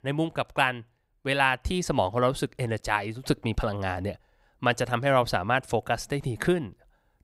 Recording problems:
none

